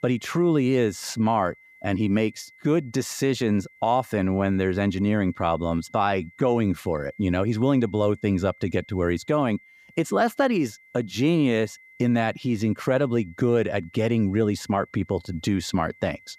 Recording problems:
high-pitched whine; faint; throughout; 2 kHz, 25 dB below the speech

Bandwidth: 15 kHz